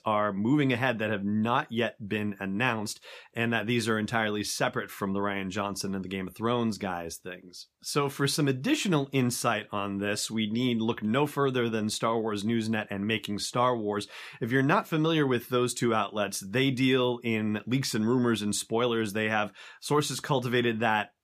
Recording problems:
none

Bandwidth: 15 kHz